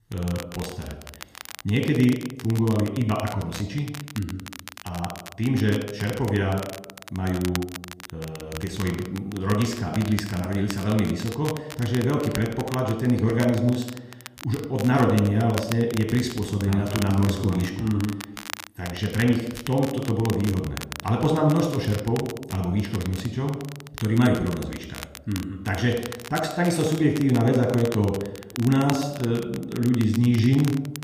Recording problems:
room echo; noticeable; dies away in 0.7 s
off-mic speech; somewhat distant
crackle, like an old record; noticeable; 15 dB below the speech

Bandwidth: 15 kHz